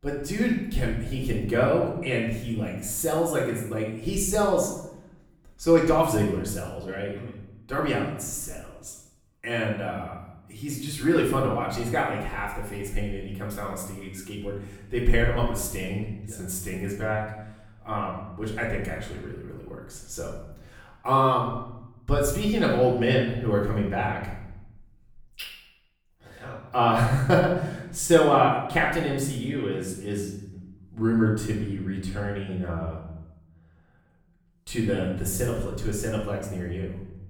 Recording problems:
off-mic speech; far
room echo; noticeable; dies away in 0.8 s

